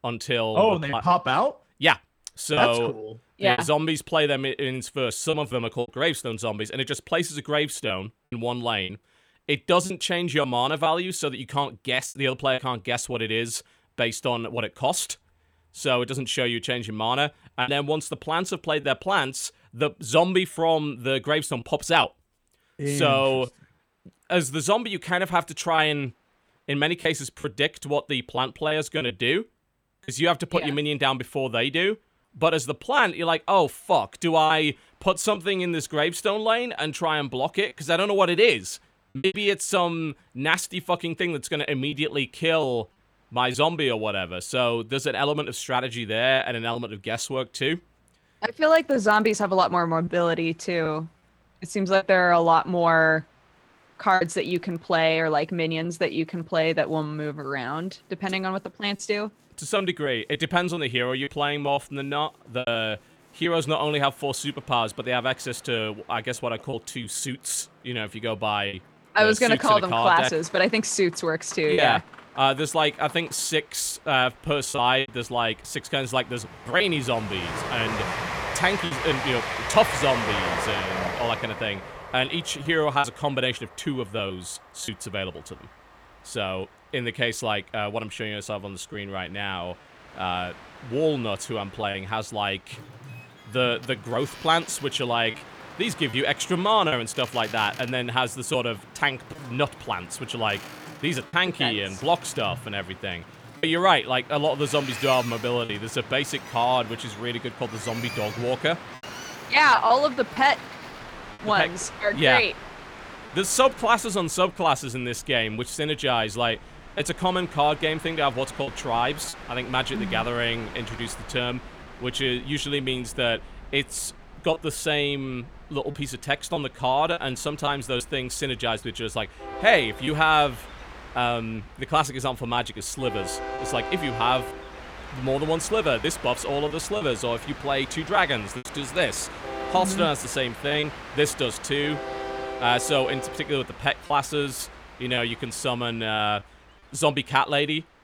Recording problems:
train or aircraft noise; noticeable; throughout; 10 dB below the speech
choppy; occasionally; 3% of the speech affected

